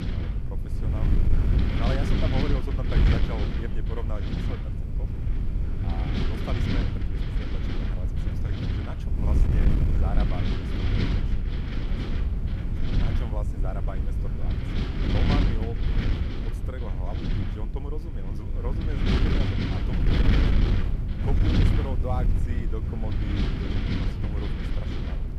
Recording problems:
wind noise on the microphone; heavy; 4 dB above the speech

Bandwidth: 14.5 kHz